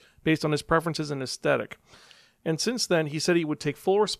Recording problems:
none

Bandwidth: 14.5 kHz